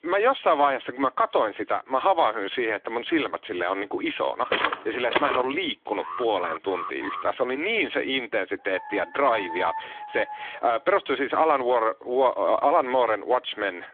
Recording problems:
phone-call audio; nothing above 3.5 kHz
footsteps; loud; at 4.5 s; peak level with the speech
alarm; noticeable; from 6 to 7 s; peak 9 dB below the speech
dog barking; noticeable; from 8.5 to 11 s; peak 7 dB below the speech

